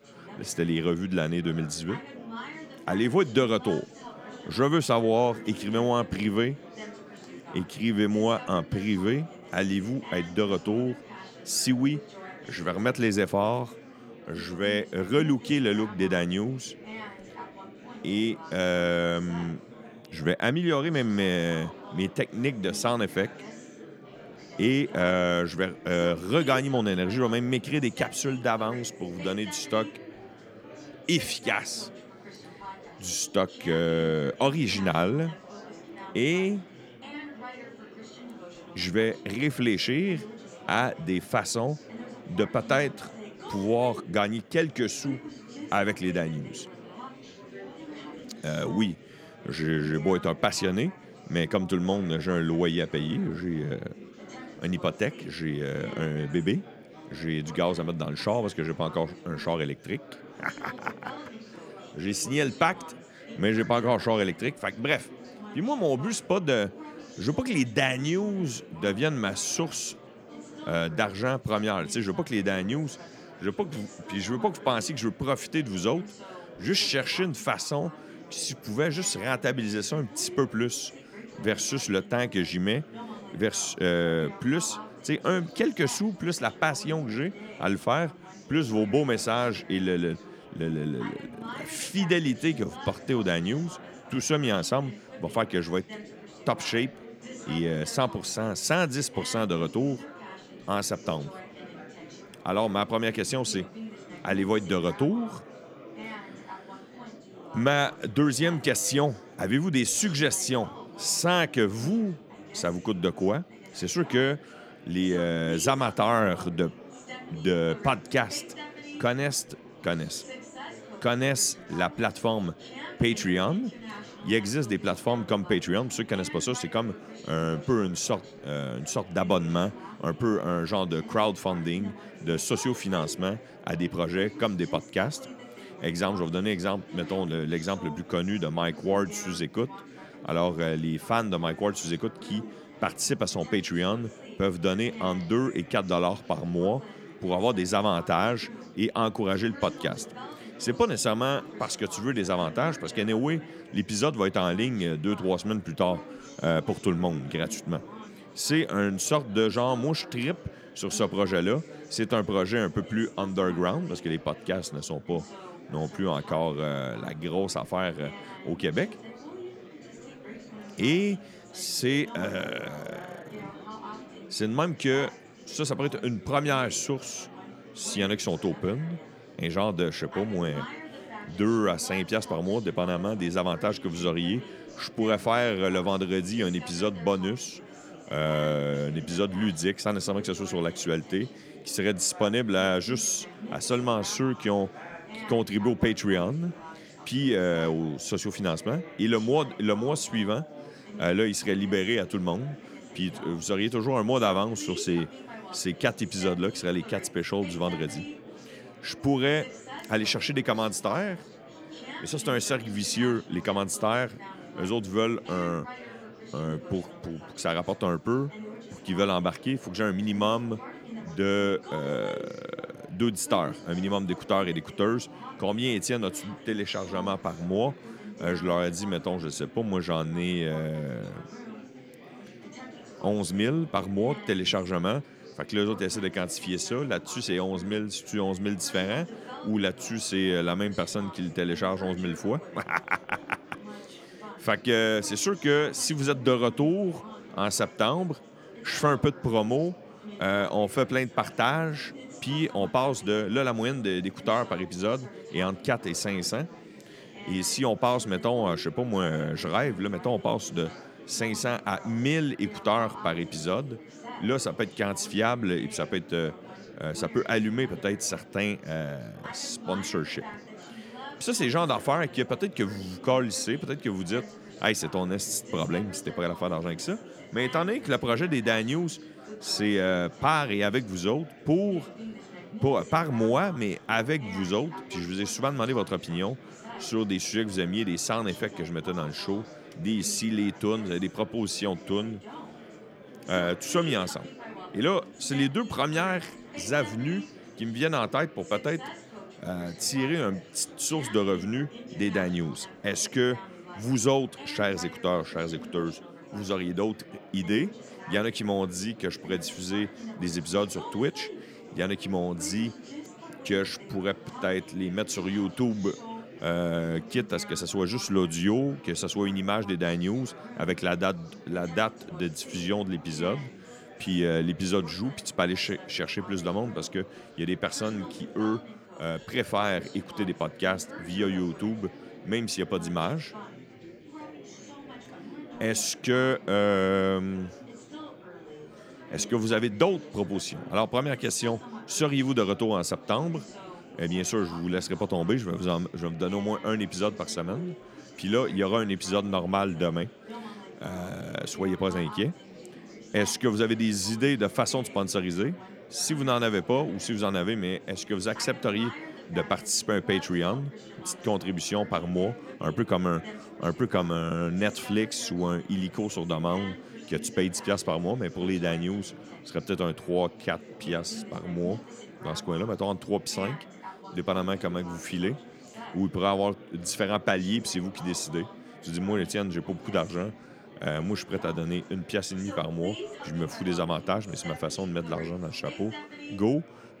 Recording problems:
chatter from many people; noticeable; throughout; 15 dB below the speech

